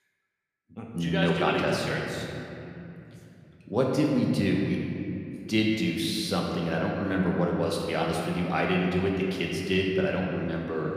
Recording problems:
room echo; noticeable; dies away in 2.6 s
off-mic speech; somewhat distant

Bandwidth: 15 kHz